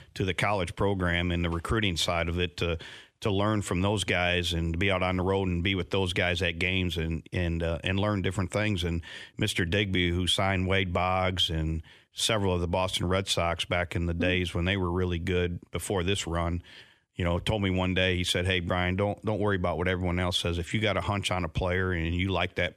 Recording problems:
none

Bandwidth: 13.5 kHz